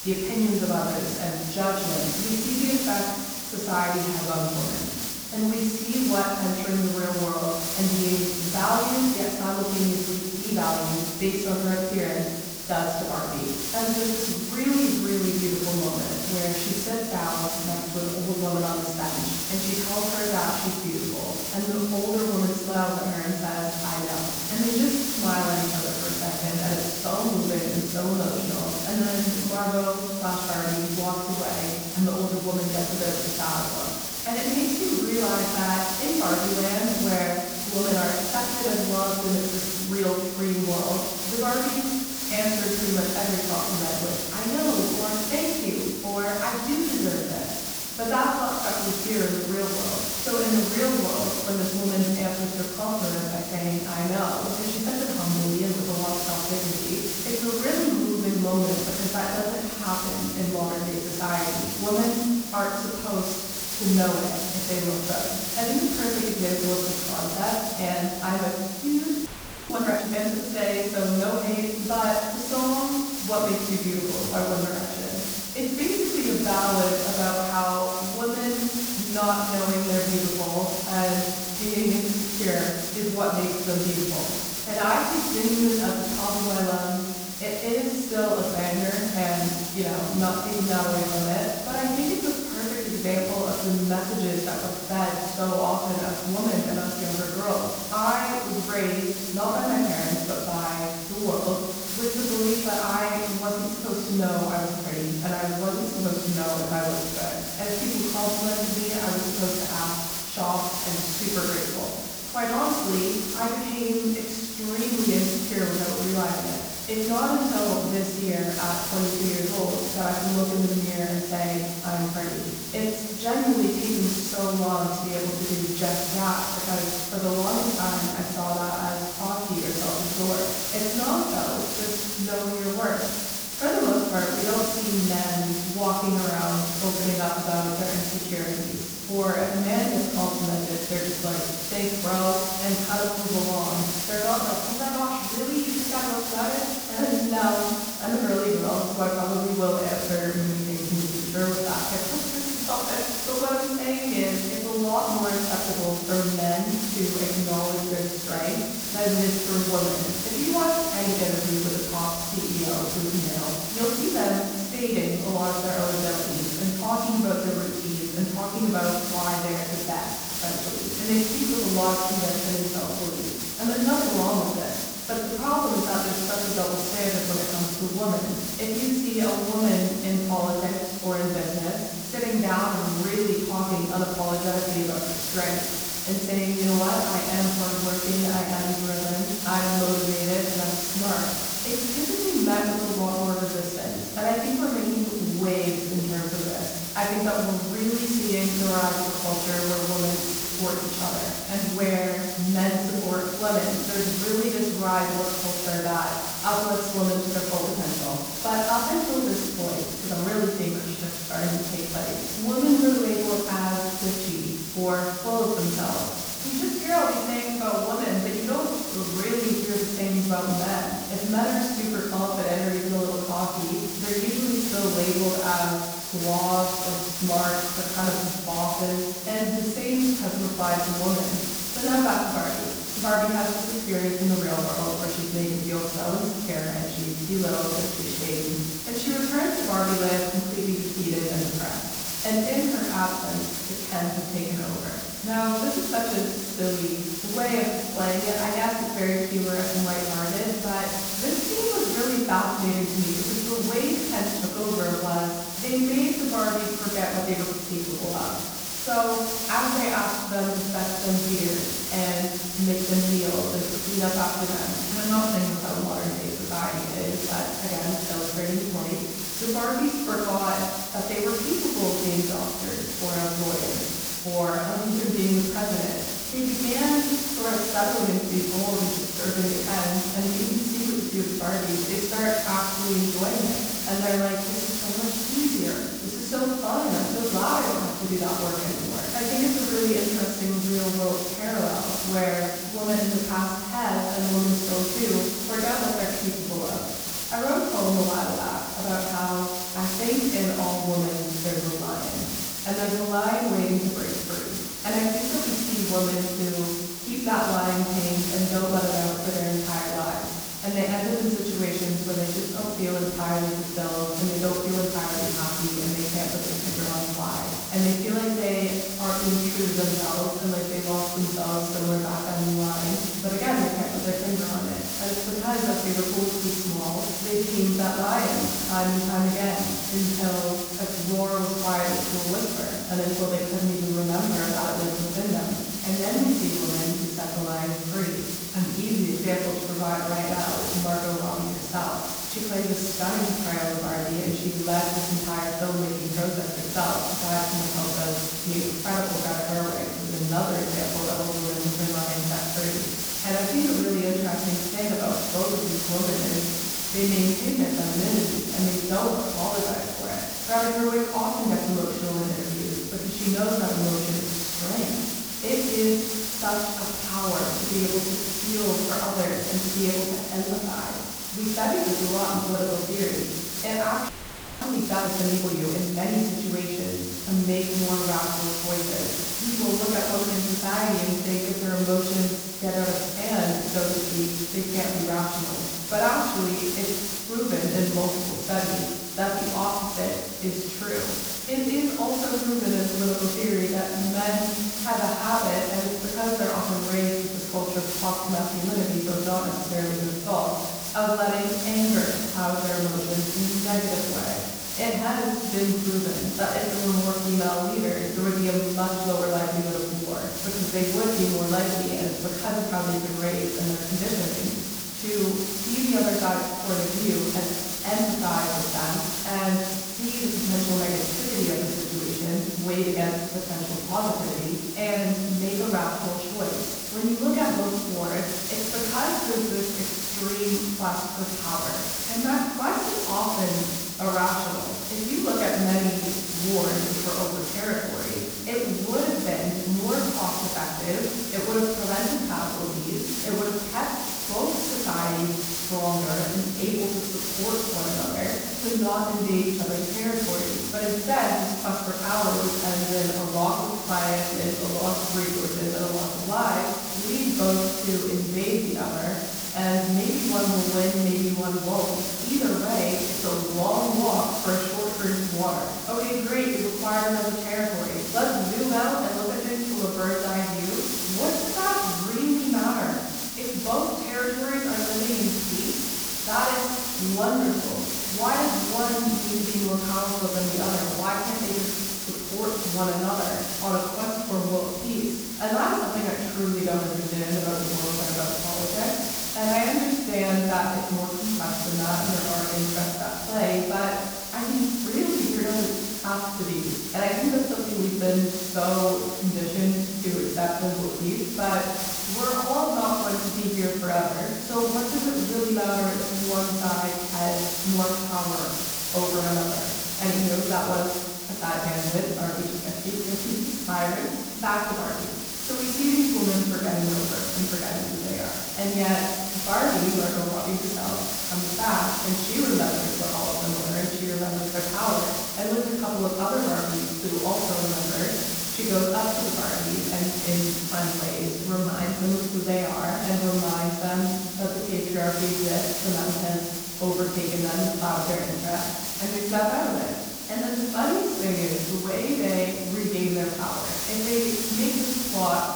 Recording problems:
off-mic speech; far
room echo; noticeable; dies away in 1.2 s
hiss; loud; throughout; 1 dB below the speech
audio freezing; at 1:09 and at 6:14 for 0.5 s

